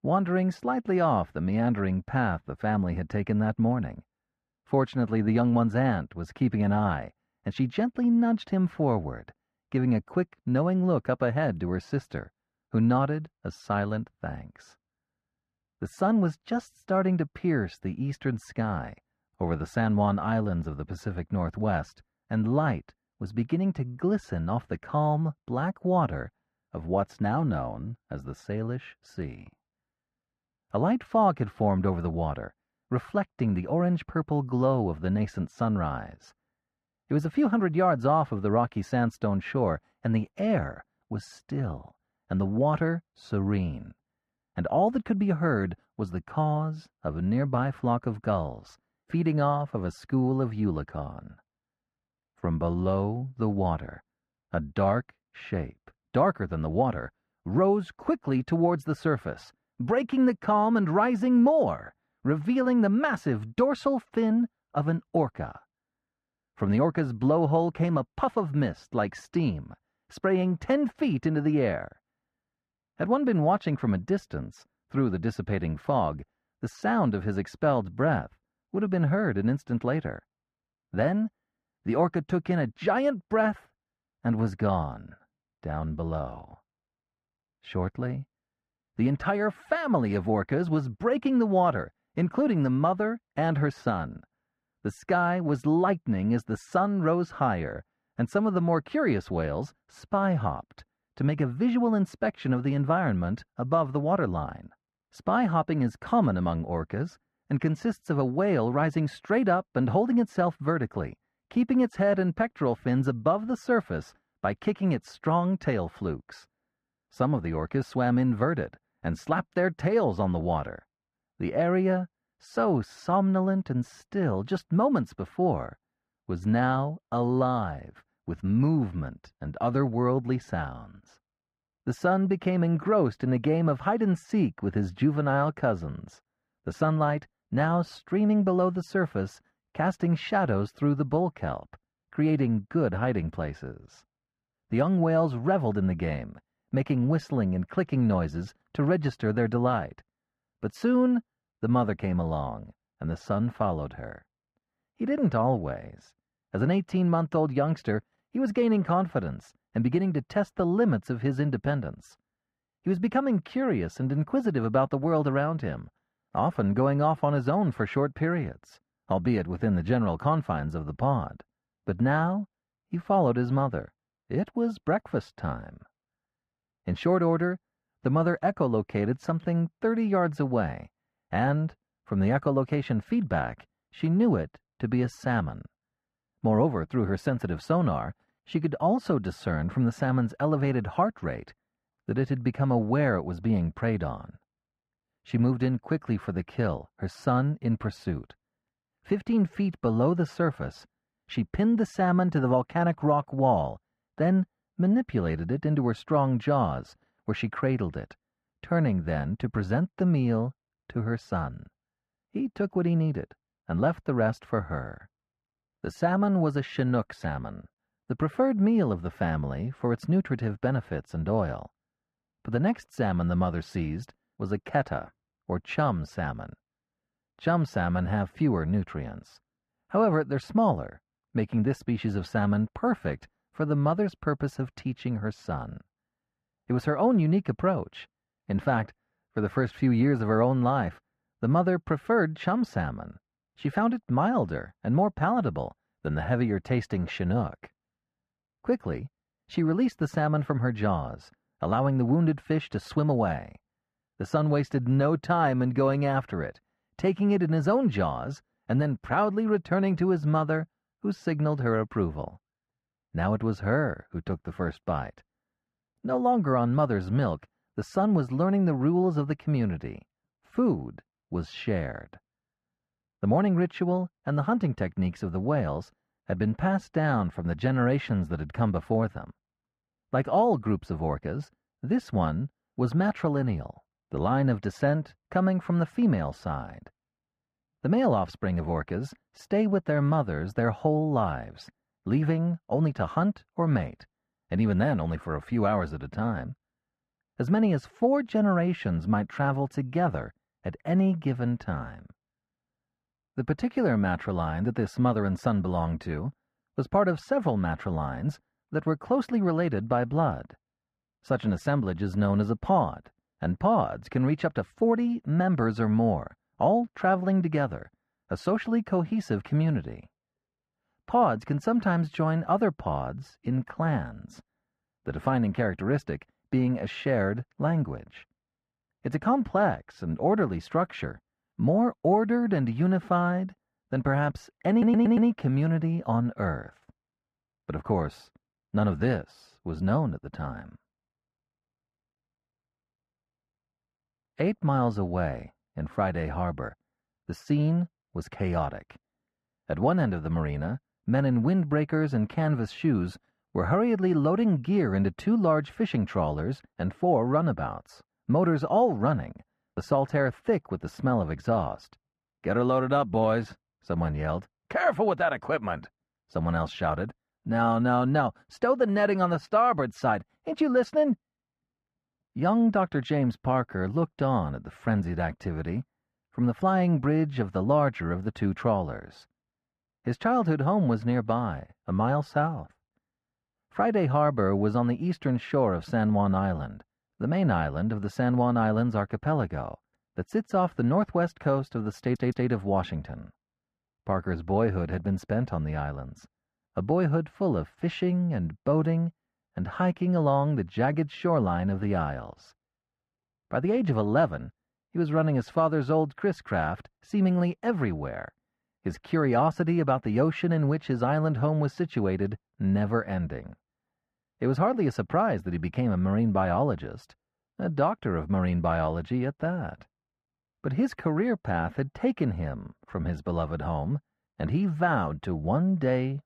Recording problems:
muffled; very; fading above 4 kHz
audio stuttering; at 5:35 and at 6:32

